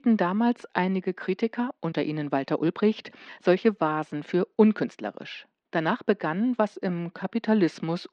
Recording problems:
muffled; slightly; fading above 3.5 kHz
uneven, jittery; strongly; from 0.5 to 7.5 s

